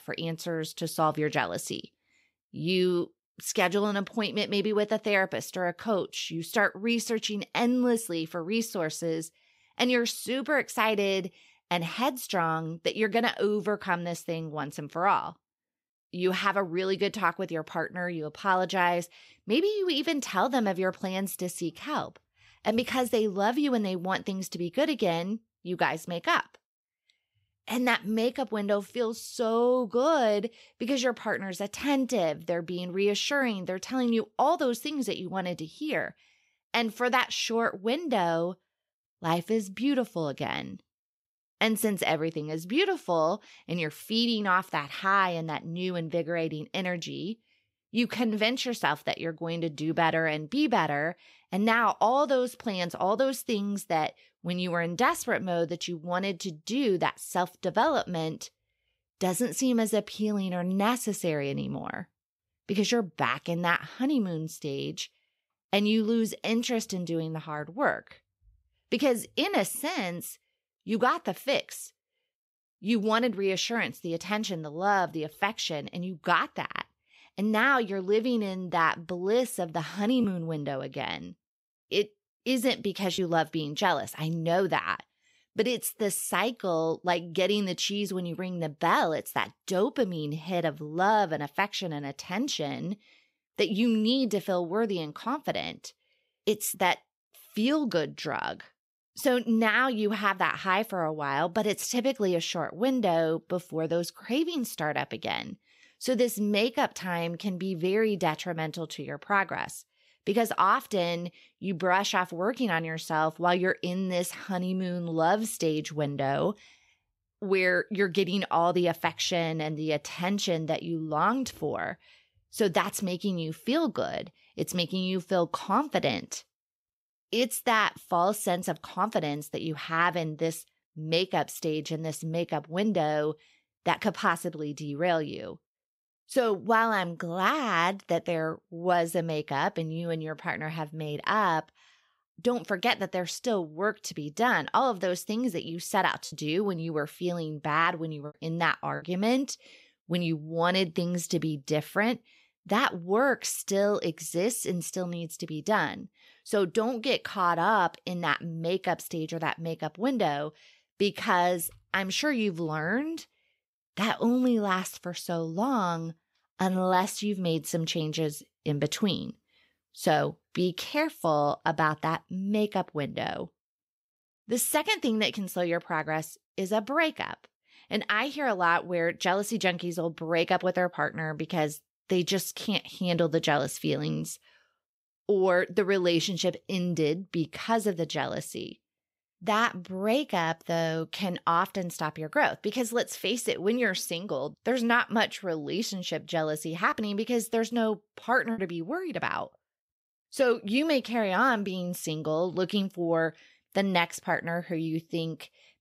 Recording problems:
choppy; occasionally; from 1:20 to 1:23, from 2:26 to 2:29 and from 3:17 to 3:19; 4% of the speech affected

